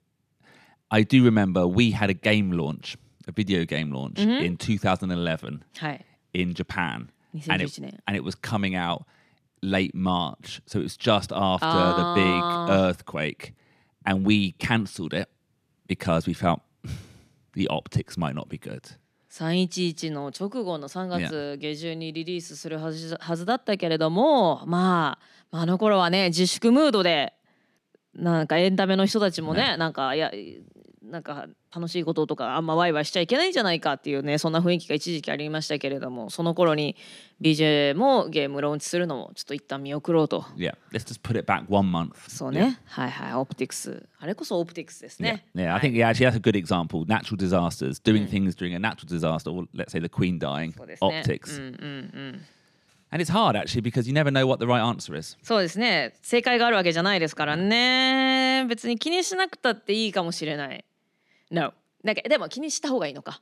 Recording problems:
none

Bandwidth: 14.5 kHz